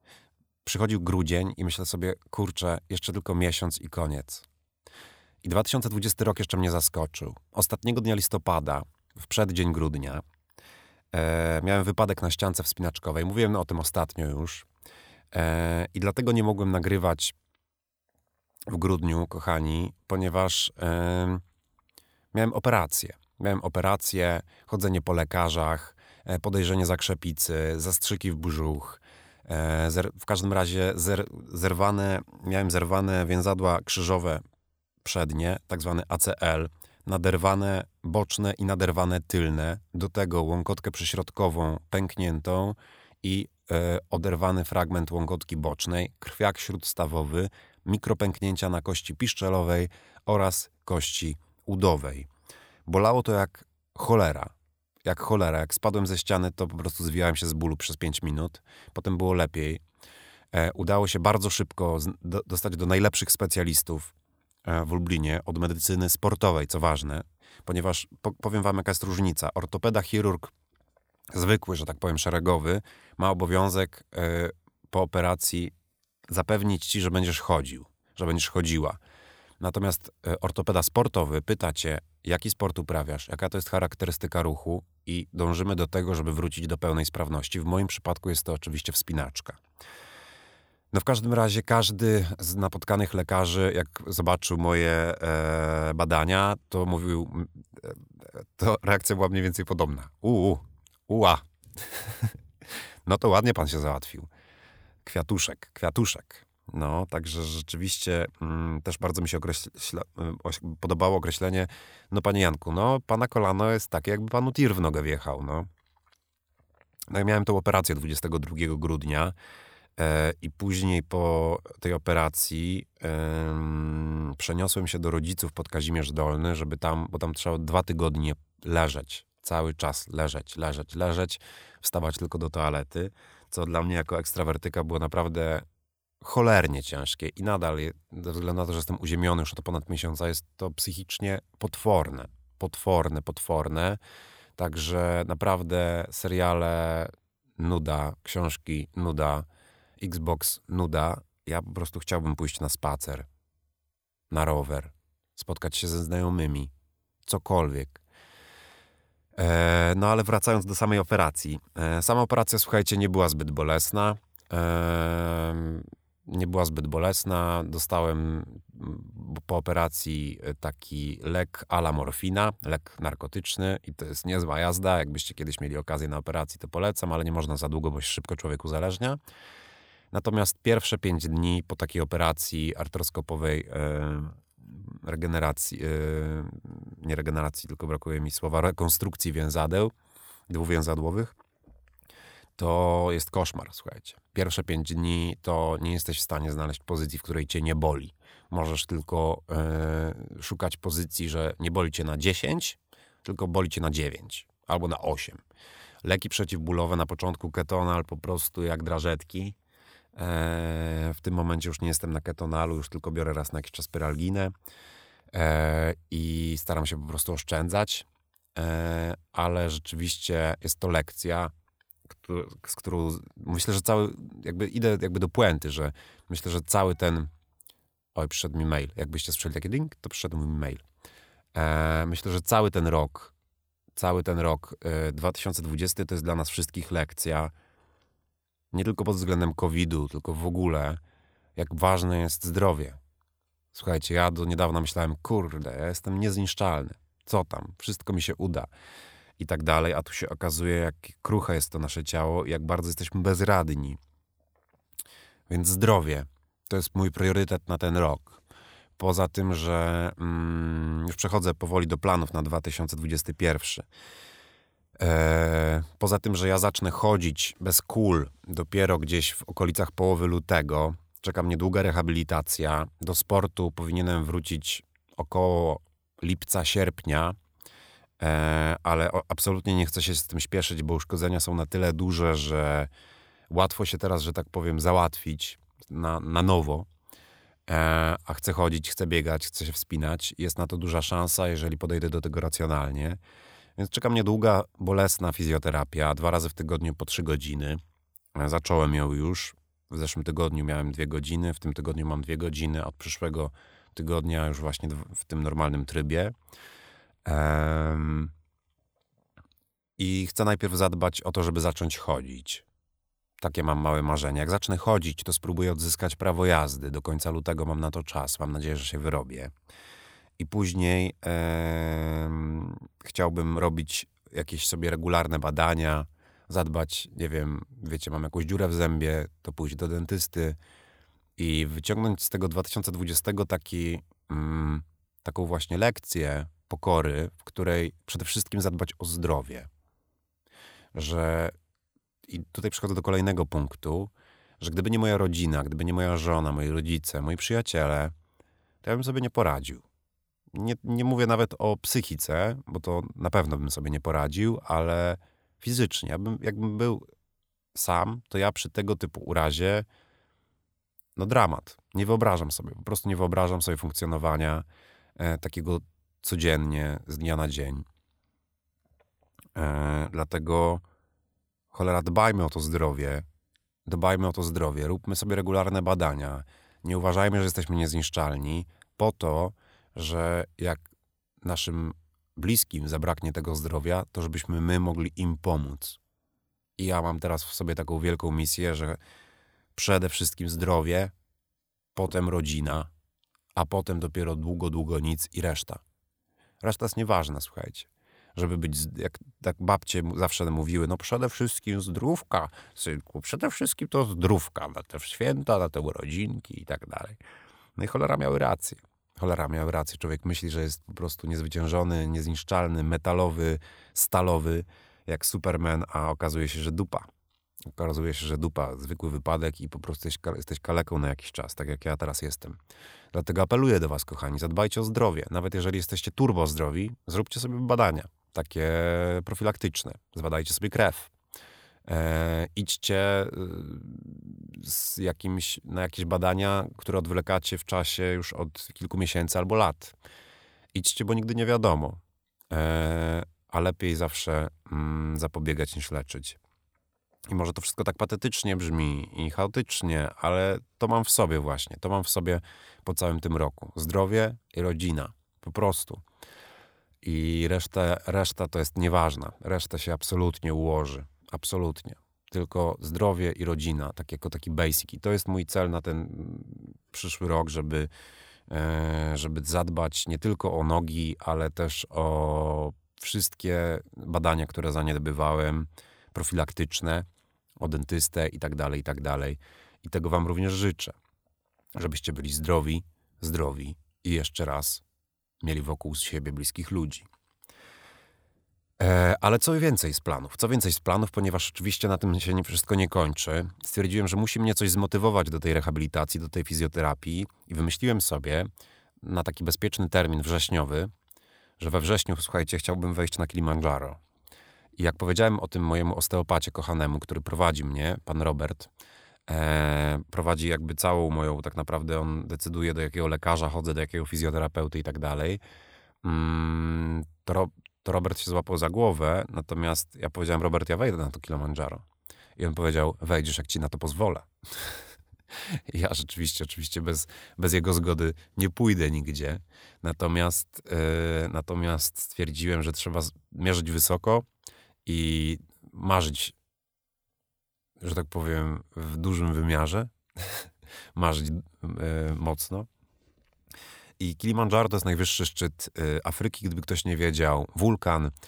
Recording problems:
none

